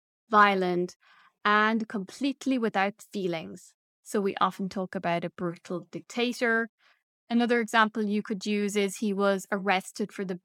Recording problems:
none

